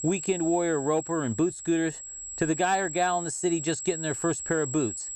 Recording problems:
high-pitched whine; loud; throughout; 7.5 kHz, 7 dB below the speech

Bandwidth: 15 kHz